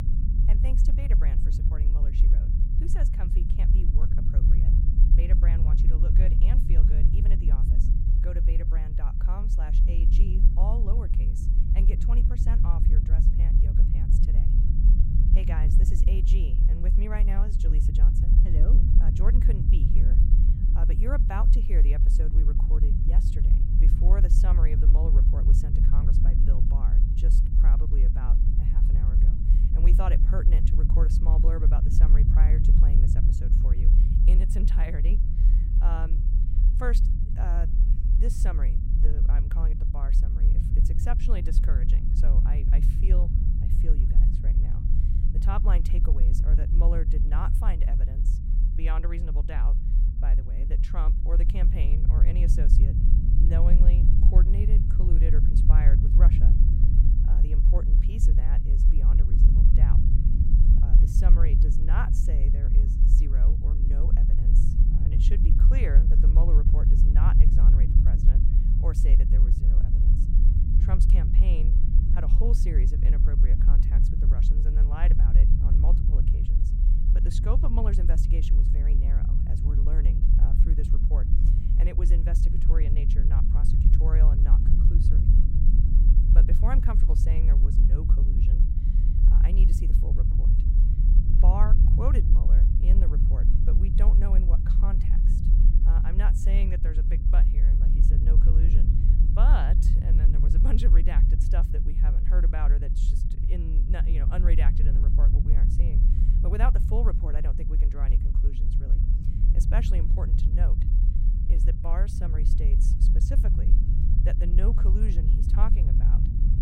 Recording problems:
low rumble; loud; throughout; 1 dB below the speech

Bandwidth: 16 kHz